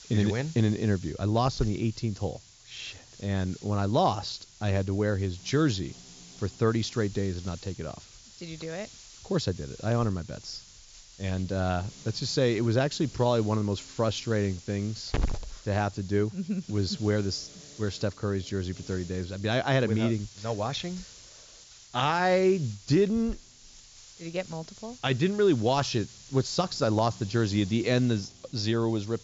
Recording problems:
high frequencies cut off; noticeable; nothing above 7.5 kHz
hiss; noticeable; throughout; 15 dB below the speech

